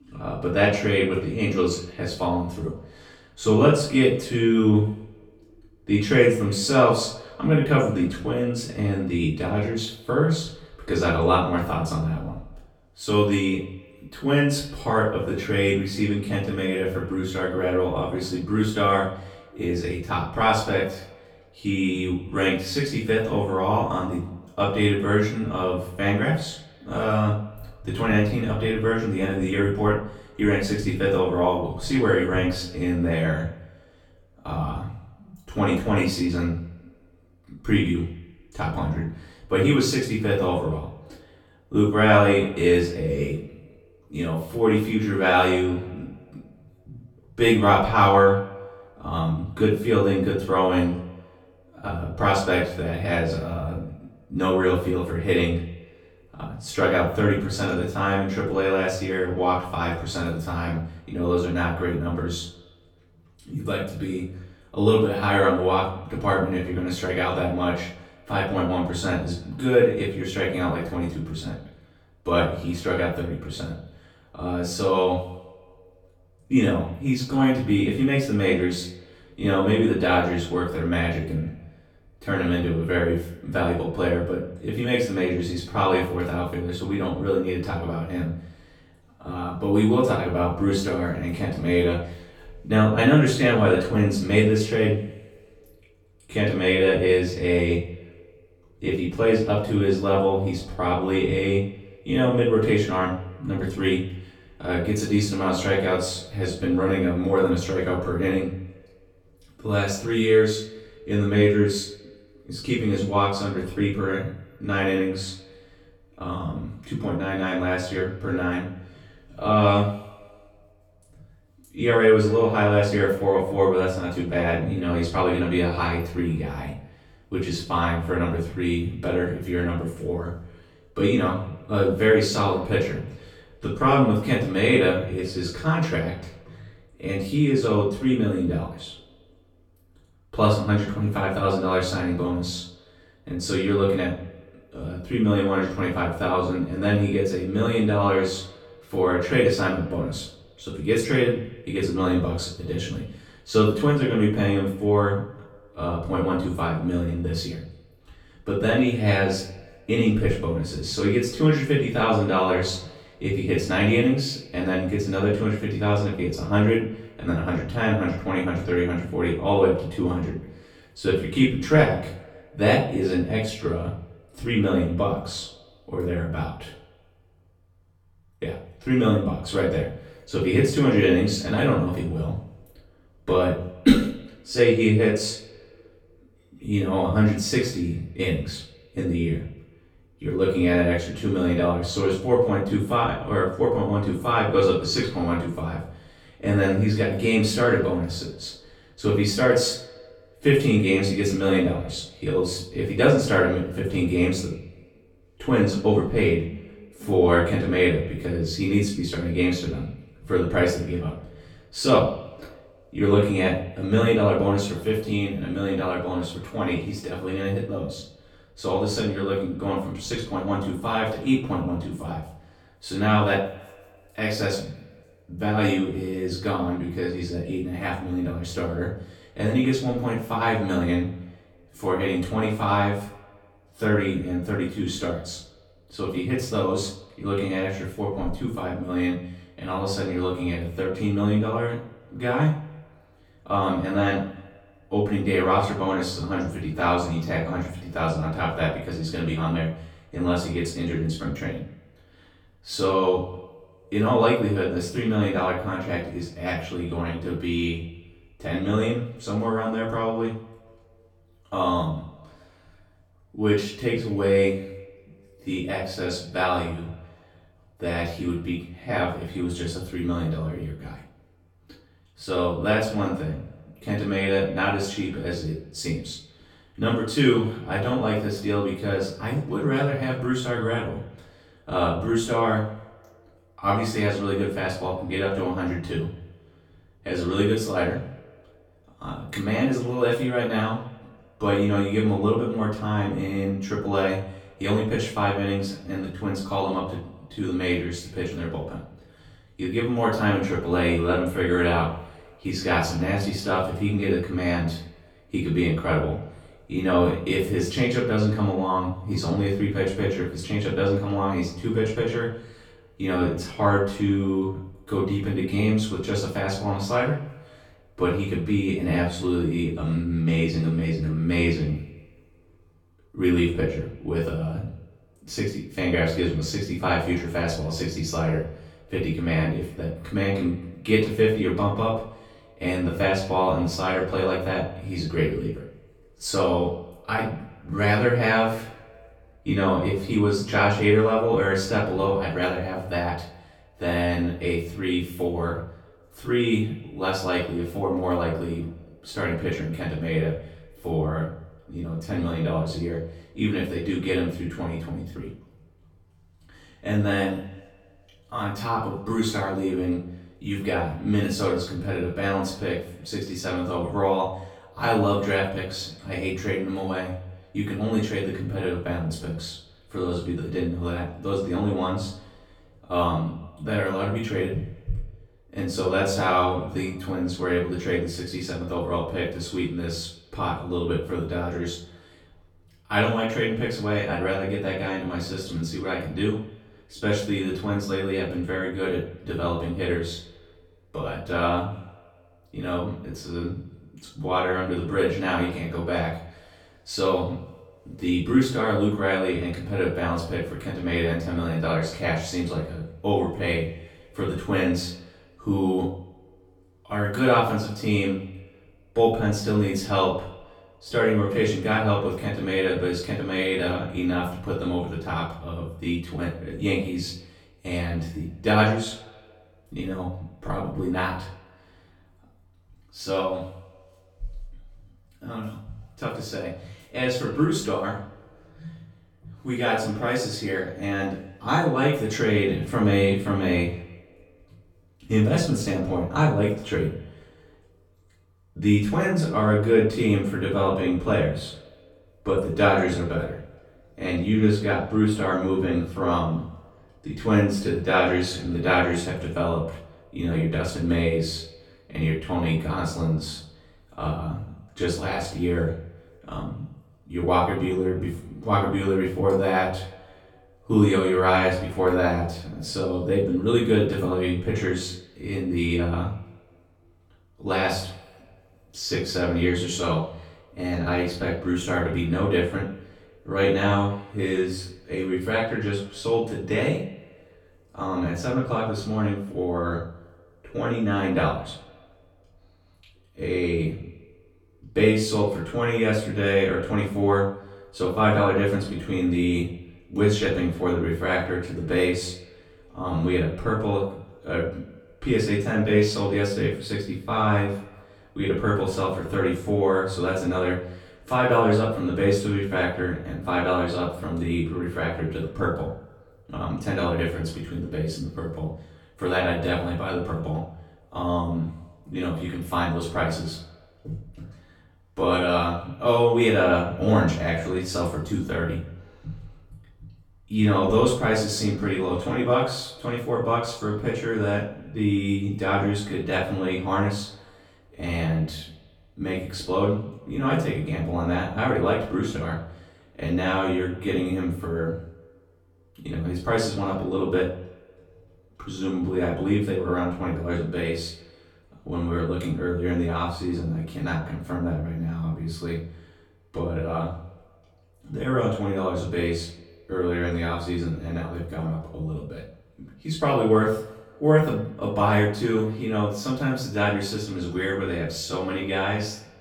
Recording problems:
off-mic speech; far
room echo; noticeable; dies away in 0.4 s
echo of what is said; faint; throughout; 130 ms later, 25 dB below the speech

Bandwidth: 17 kHz